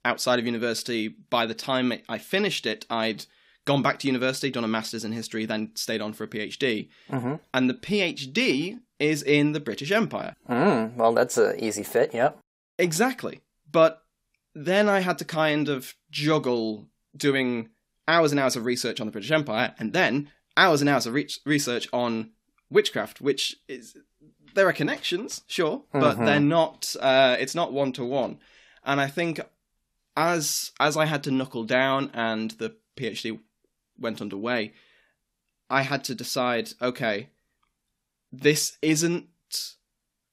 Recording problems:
none

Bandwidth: 15.5 kHz